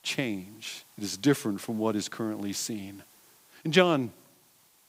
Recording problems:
hiss; faint; throughout; 25 dB below the speech

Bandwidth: 15.5 kHz